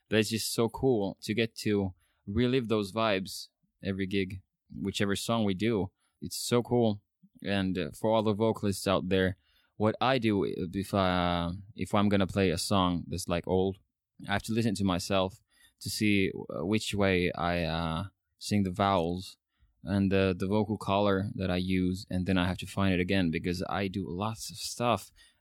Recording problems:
none

